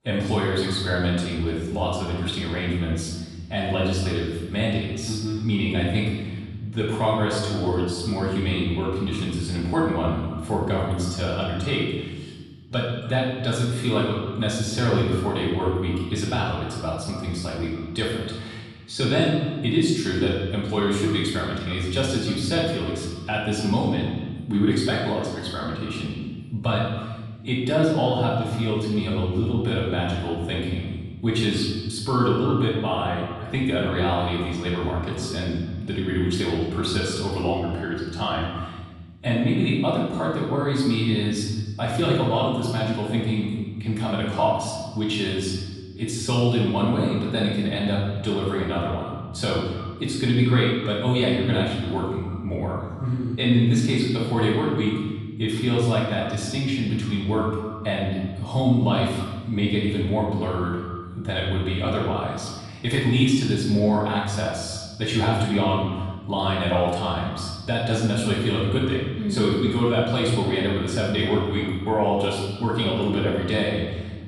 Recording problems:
off-mic speech; far
room echo; noticeable; dies away in 1.3 s
echo of what is said; faint; throughout; 290 ms later, 20 dB below the speech

